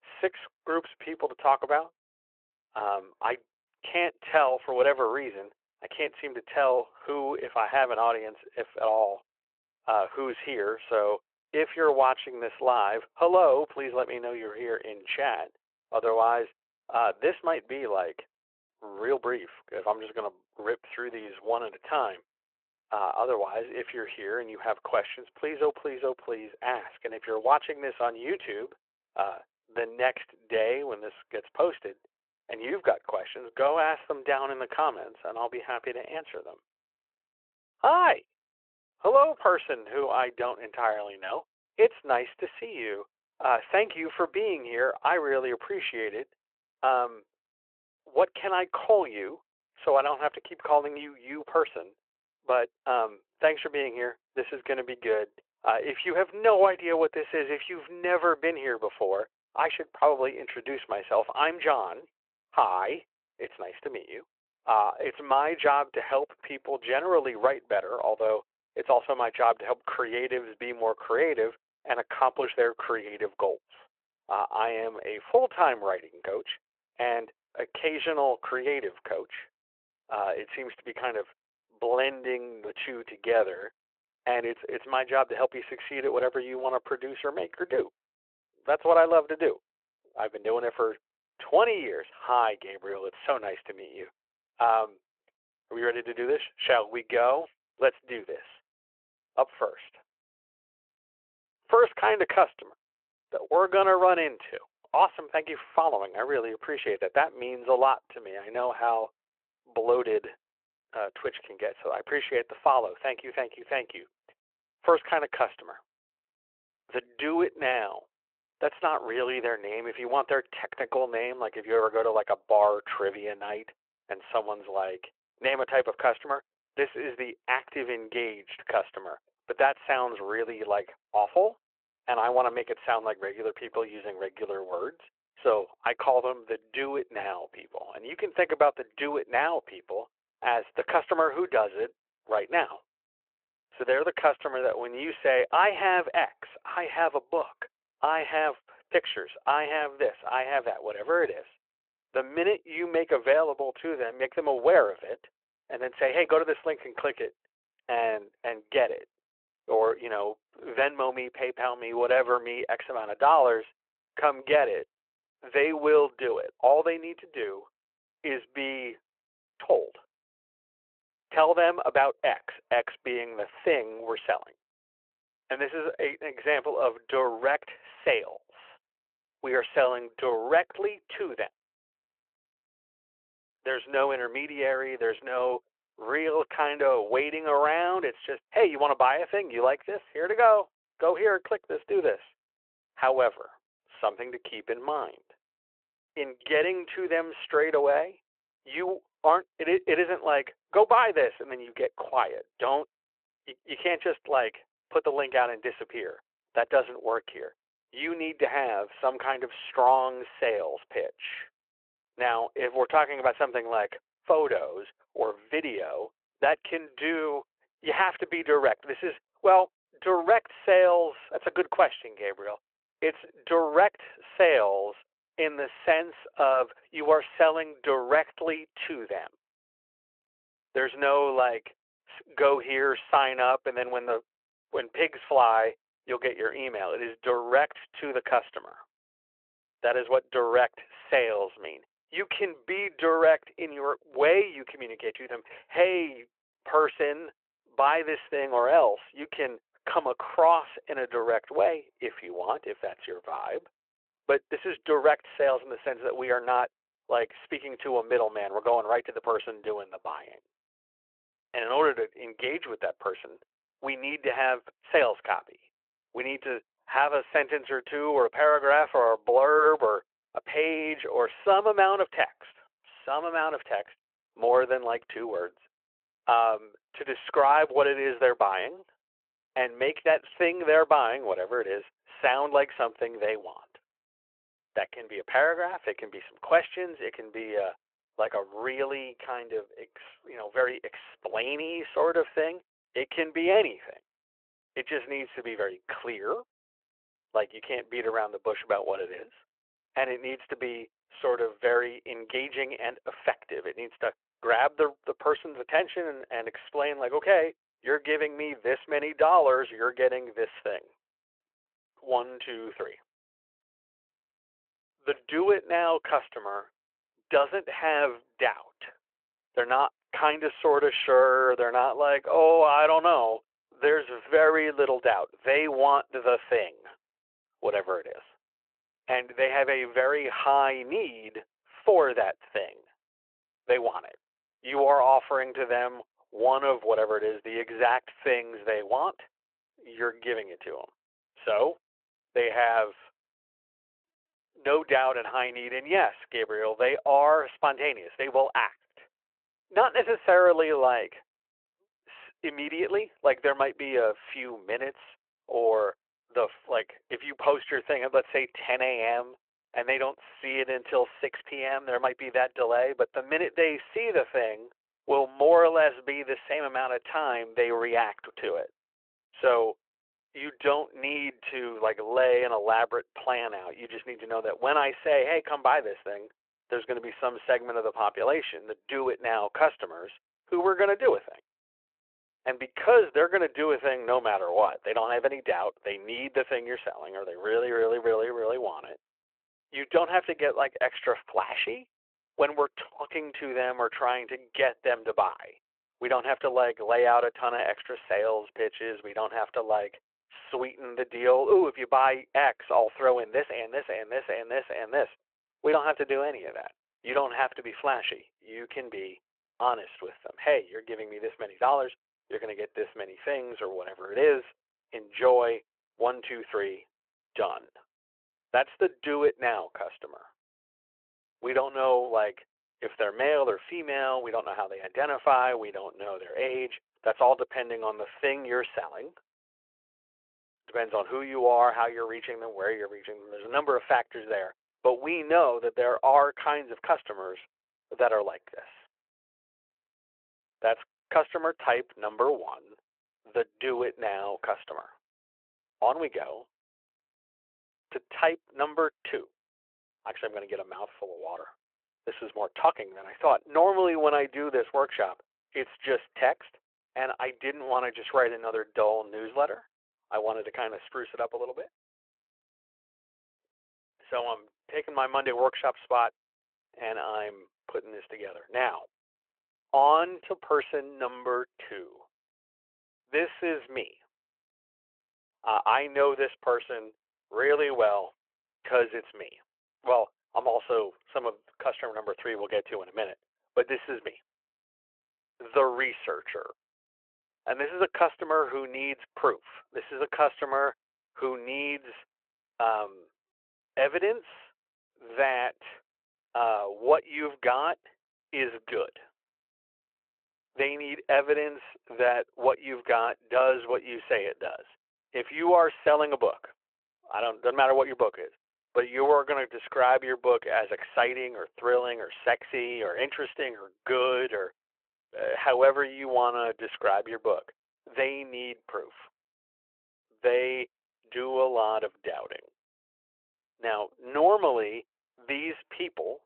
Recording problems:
phone-call audio

